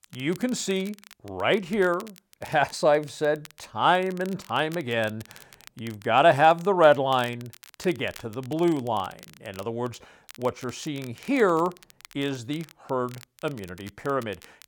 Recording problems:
crackle, like an old record; faint; 25 dB below the speech

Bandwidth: 18 kHz